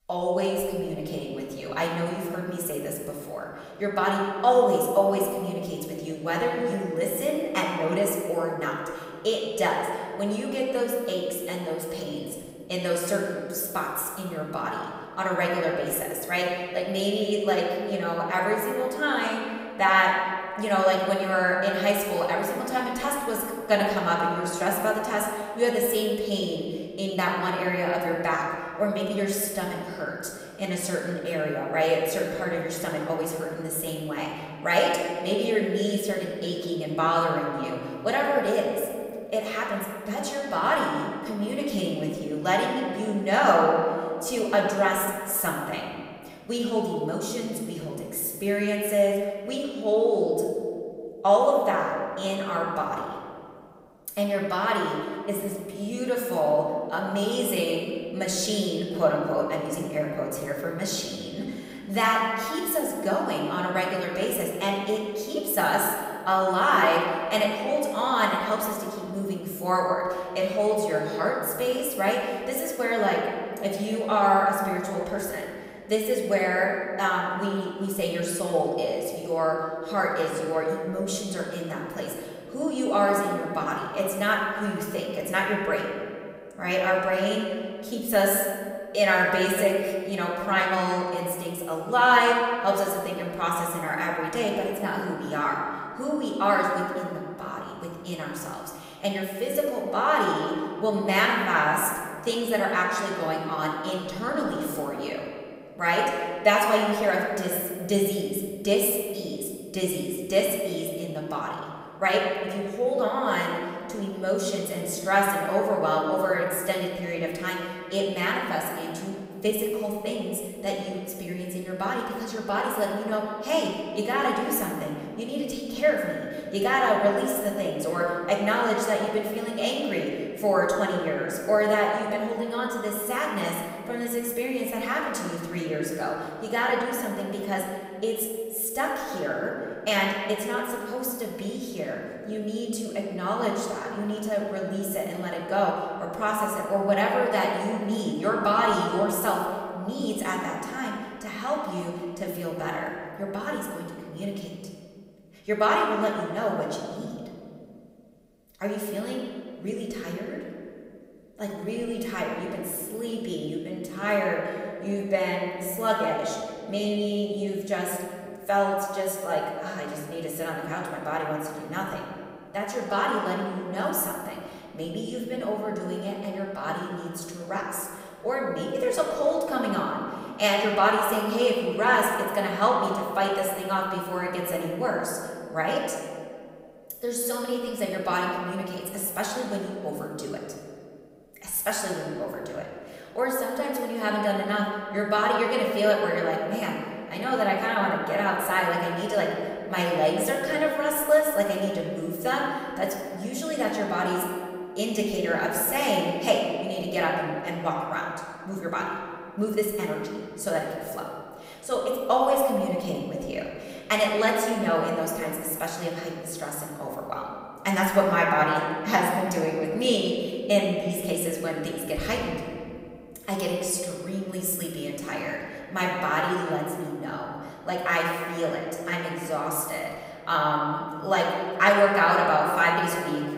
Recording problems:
off-mic speech; far
room echo; noticeable; dies away in 1.9 s

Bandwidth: 15.5 kHz